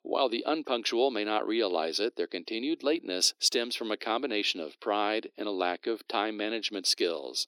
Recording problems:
thin; very; fading below 300 Hz

